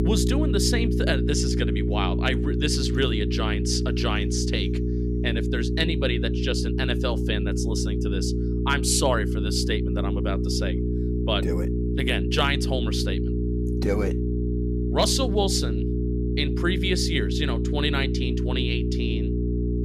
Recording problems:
electrical hum; loud; throughout; 60 Hz, 5 dB below the speech

